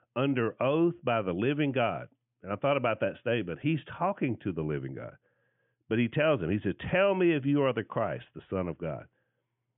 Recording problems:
high frequencies cut off; severe; nothing above 3.5 kHz

